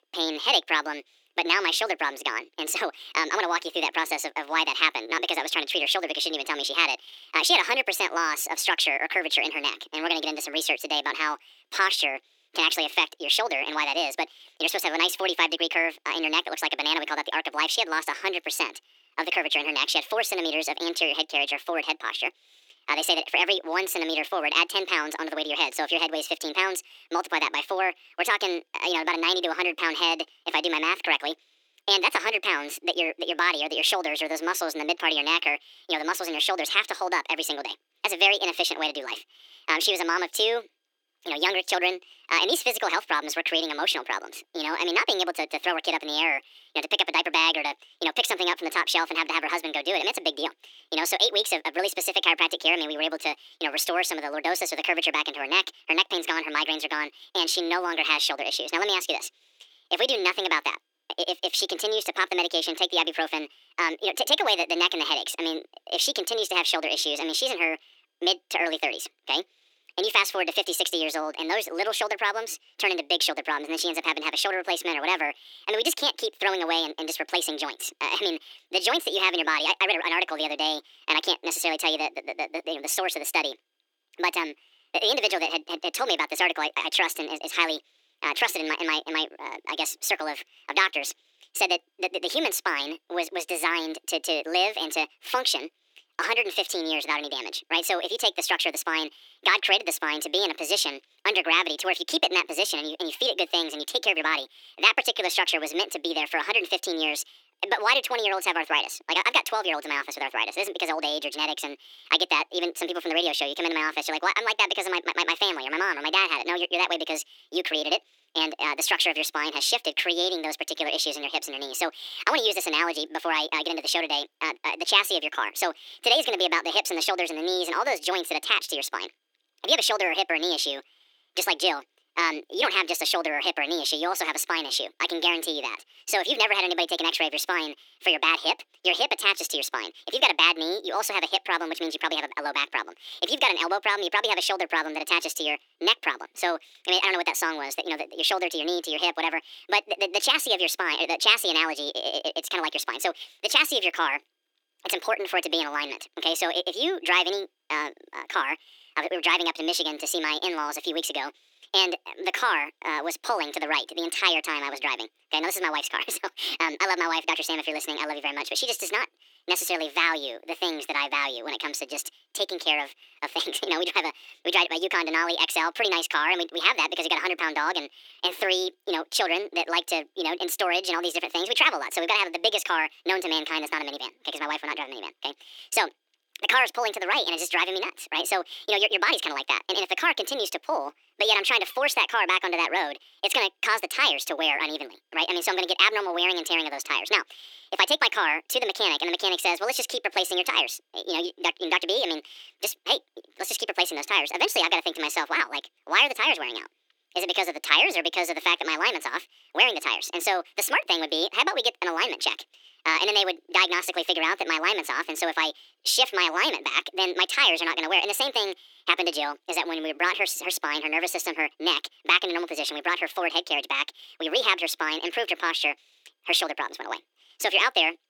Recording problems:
thin; very; fading below 300 Hz
wrong speed and pitch; too fast and too high; 1.6 times normal speed

